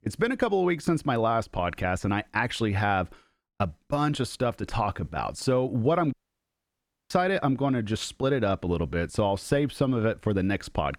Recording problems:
audio cutting out; at 6 s for 1 s

